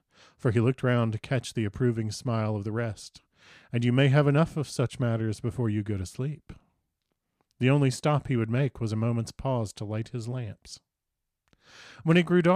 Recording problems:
abrupt cut into speech; at the end

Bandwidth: 14.5 kHz